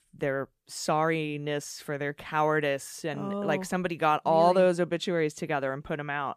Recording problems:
none

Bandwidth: 14.5 kHz